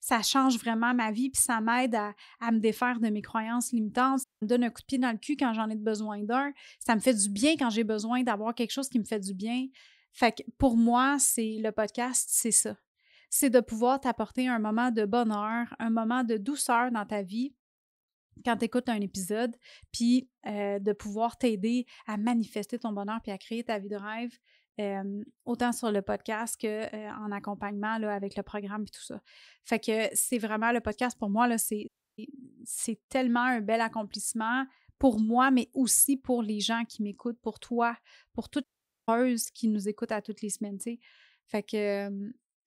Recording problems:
audio cutting out; at 4 s, at 32 s and at 39 s

